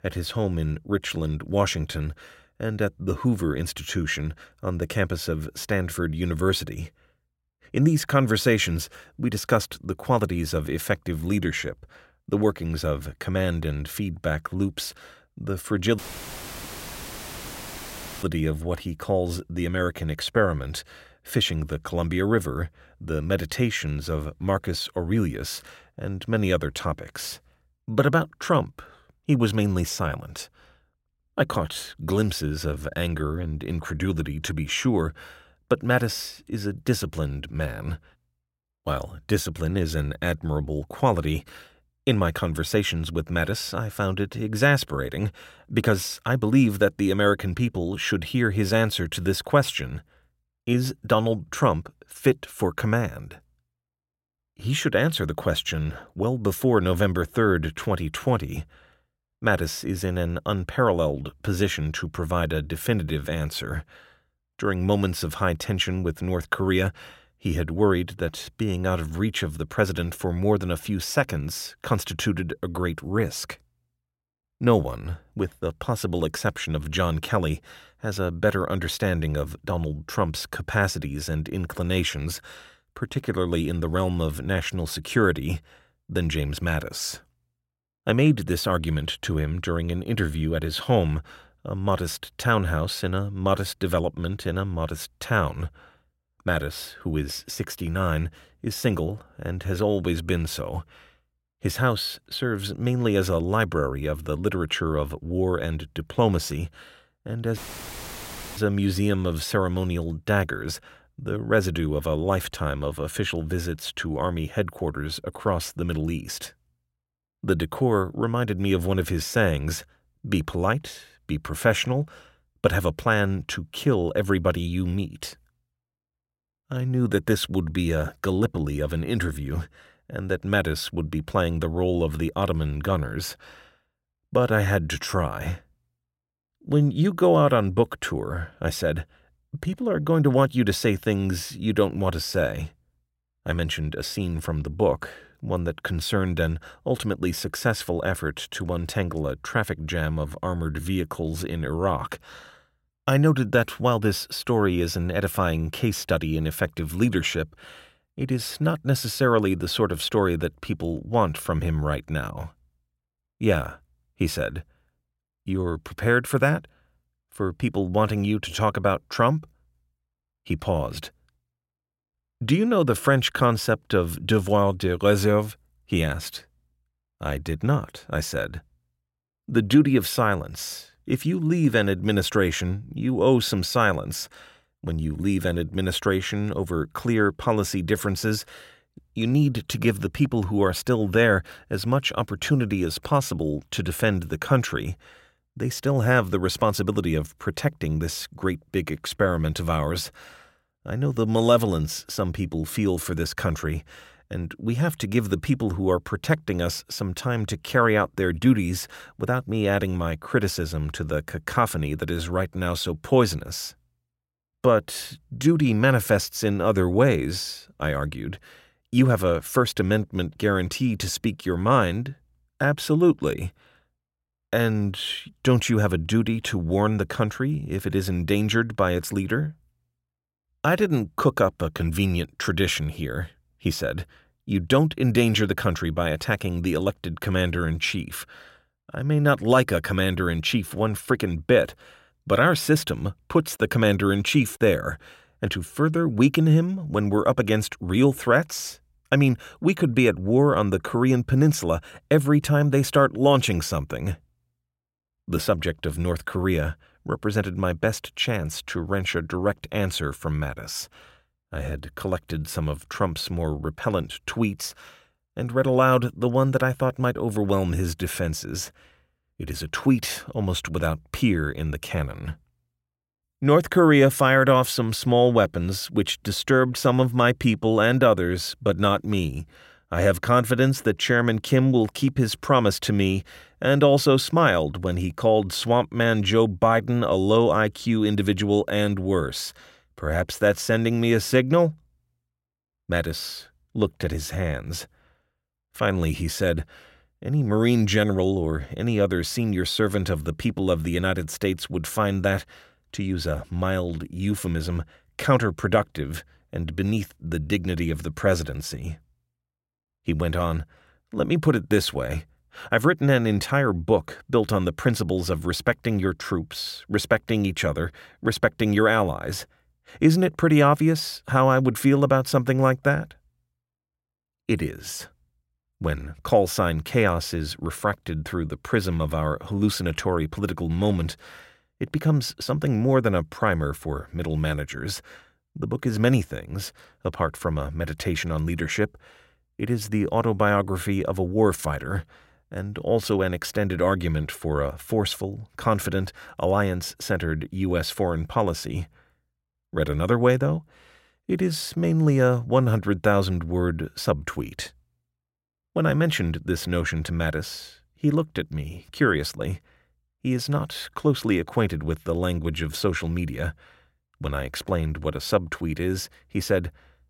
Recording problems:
audio cutting out; filled with static; at 16 s for 2.5 s and at 1:48 for 1 s

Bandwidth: 16 kHz